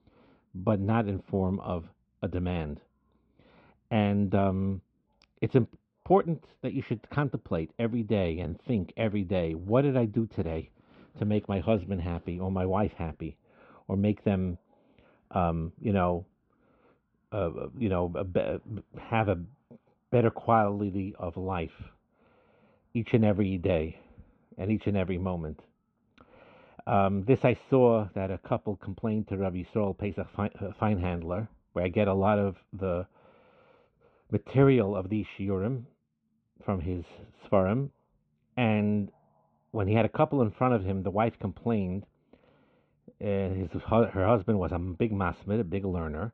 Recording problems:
muffled; very; fading above 3 kHz

